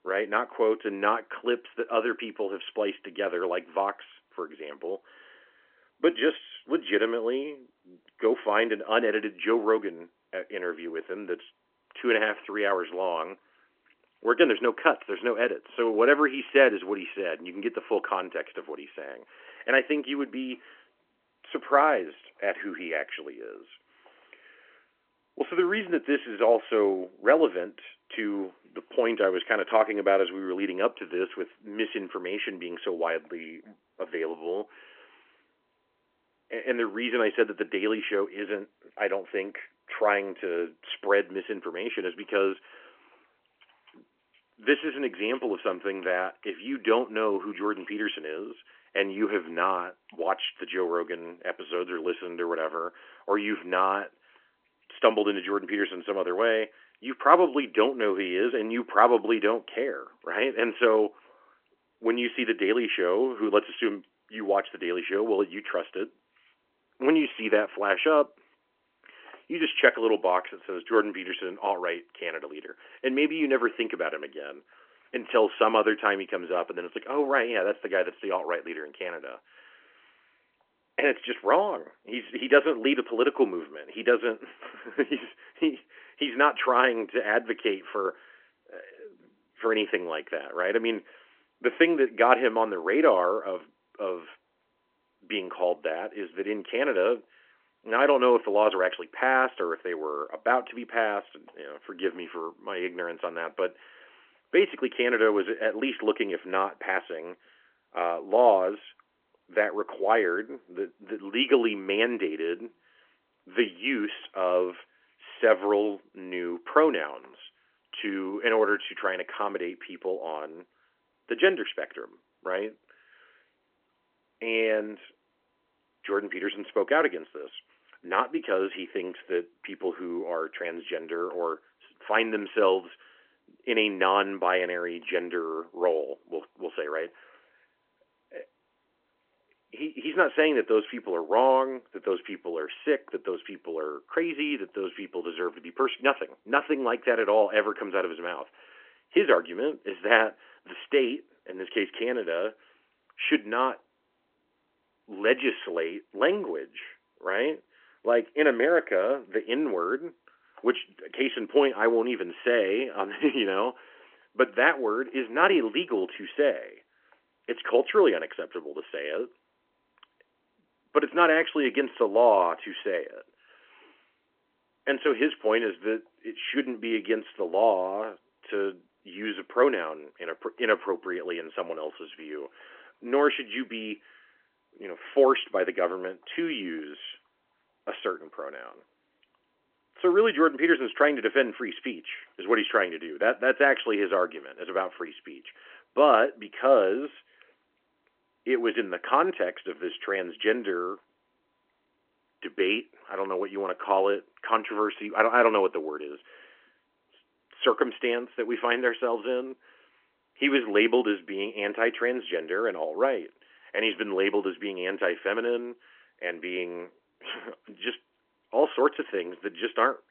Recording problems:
phone-call audio; nothing above 3 kHz

